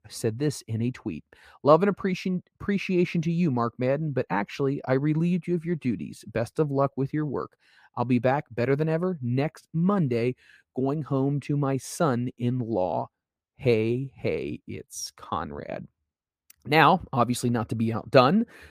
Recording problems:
muffled; slightly; fading above 3 kHz

